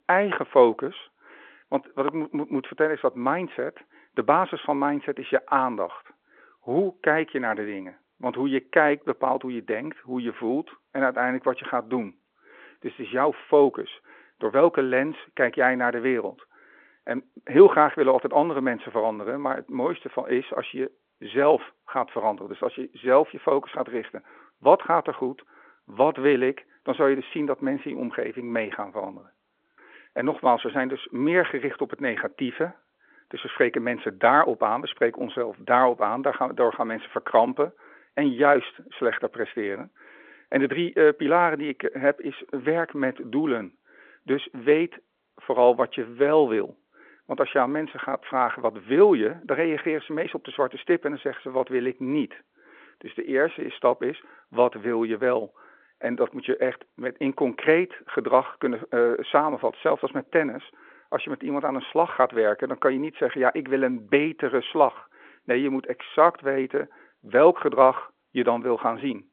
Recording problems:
phone-call audio; nothing above 3.5 kHz

